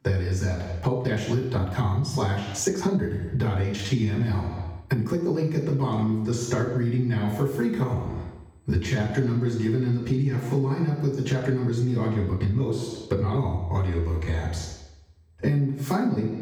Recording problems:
off-mic speech; far
room echo; noticeable; dies away in 0.8 s
squashed, flat; somewhat
uneven, jittery; strongly; from 1 to 14 s

